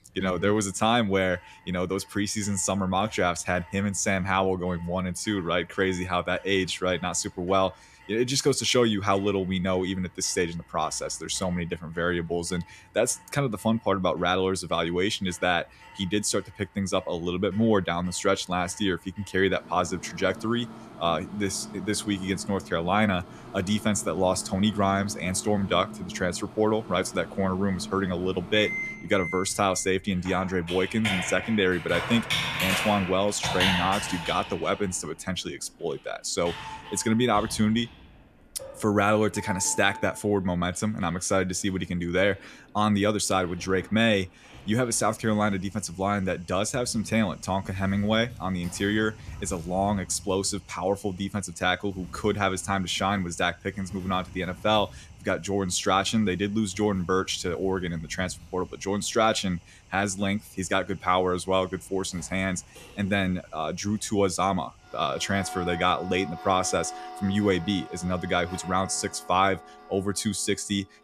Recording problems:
household noises; noticeable; throughout; 10 dB below the speech

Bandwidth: 14.5 kHz